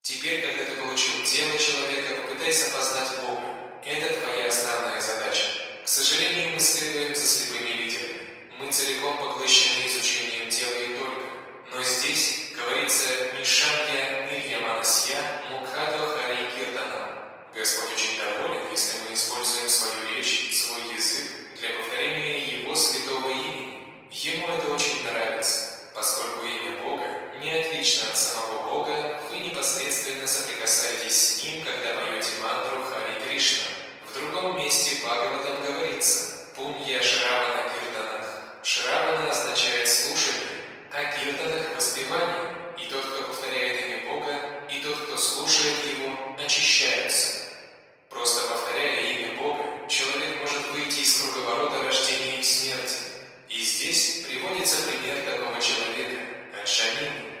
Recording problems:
room echo; strong; dies away in 1.9 s
off-mic speech; far
thin; very; fading below 850 Hz
garbled, watery; slightly; nothing above 19 kHz

